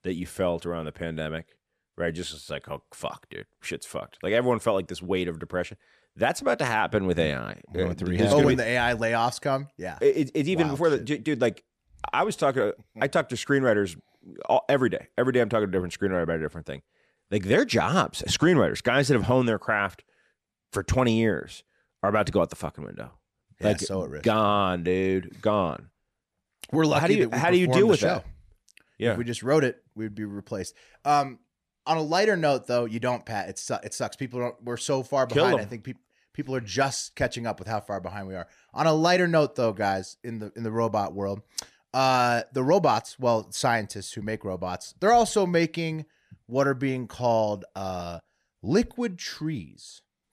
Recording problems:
none

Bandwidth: 14.5 kHz